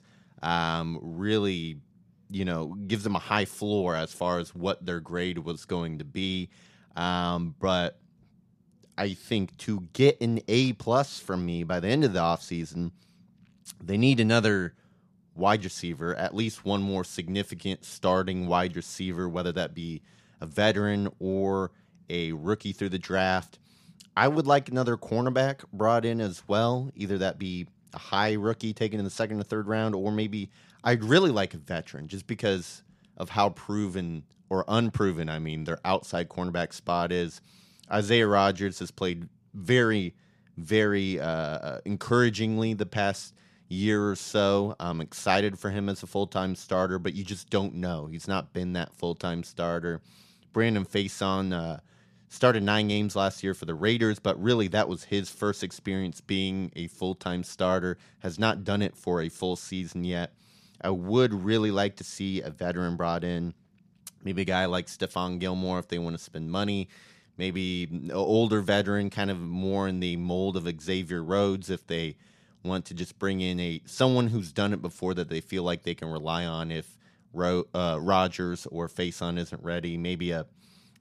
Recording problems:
none

